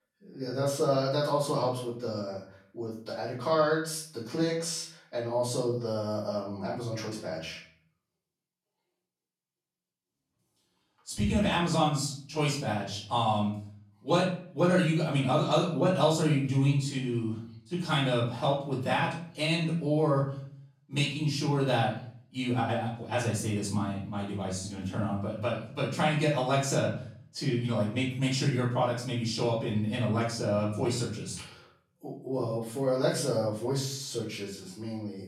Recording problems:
off-mic speech; far
room echo; noticeable; dies away in 0.5 s

